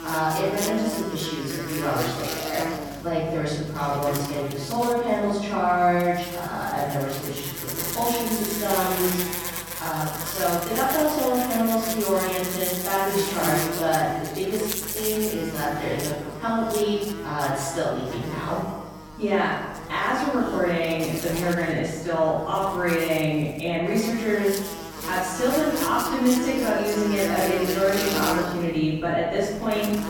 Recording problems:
room echo; strong; dies away in 1 s
off-mic speech; far
electrical hum; loud; throughout; 50 Hz, 7 dB below the speech

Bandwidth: 17.5 kHz